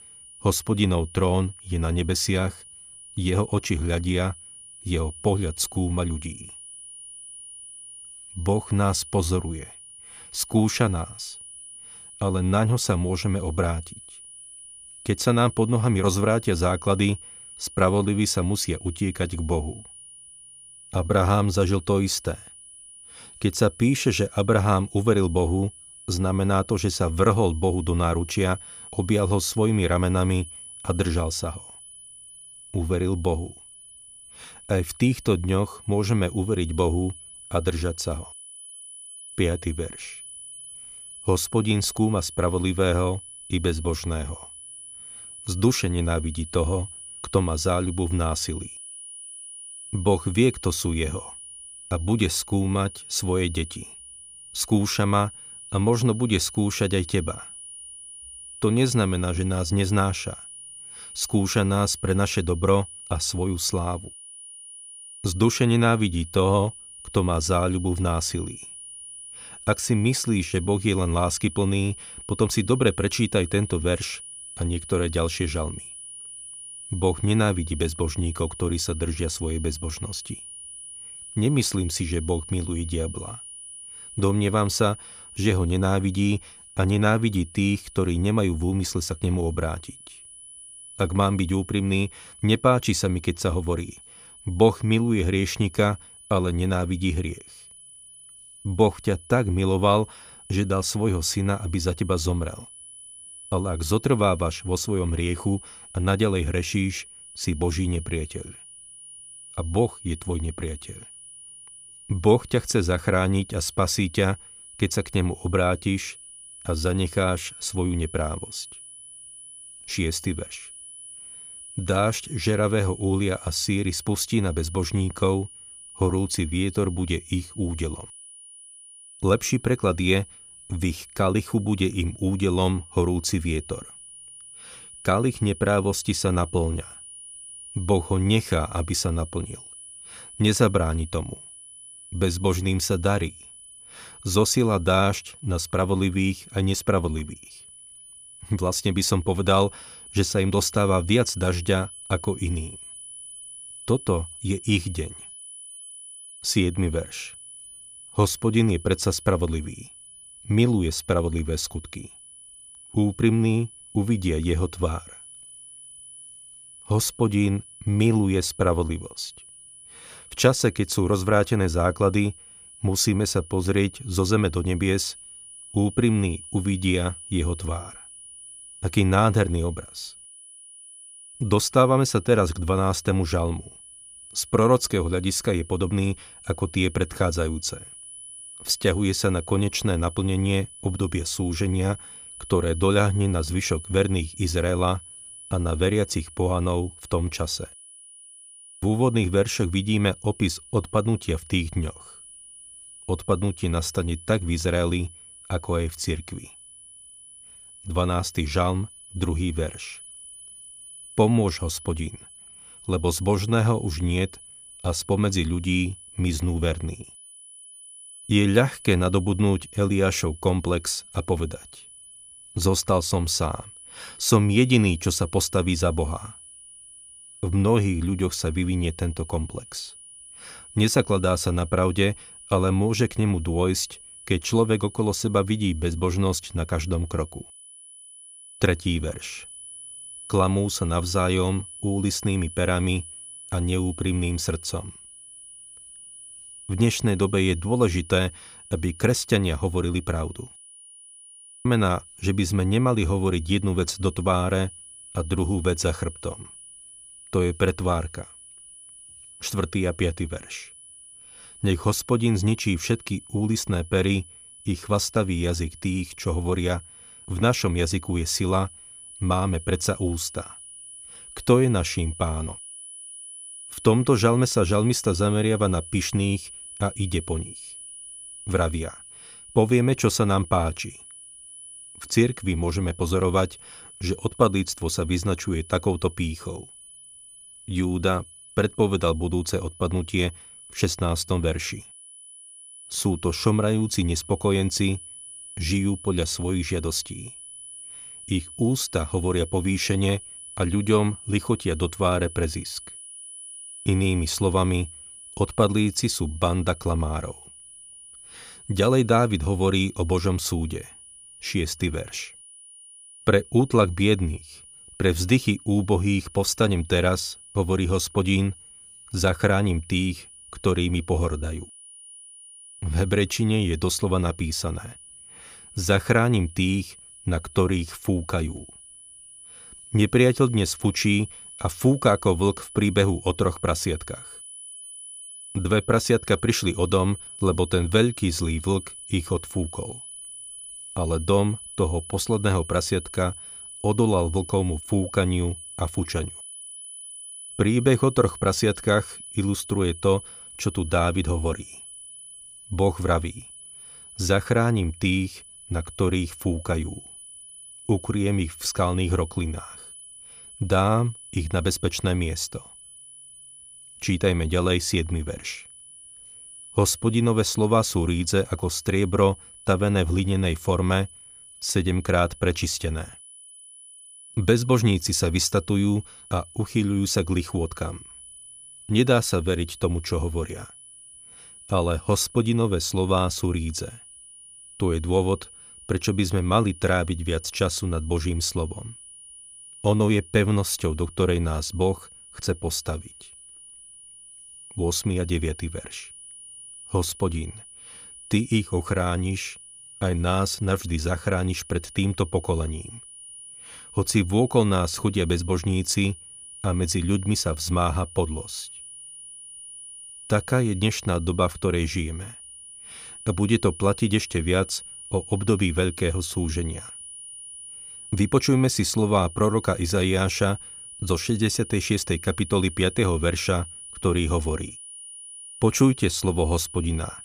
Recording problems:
high-pitched whine; noticeable; throughout; 9.5 kHz, 15 dB below the speech

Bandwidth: 15 kHz